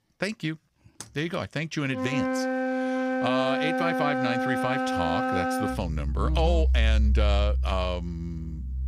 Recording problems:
background music; very loud; throughout; 3 dB above the speech

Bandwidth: 15.5 kHz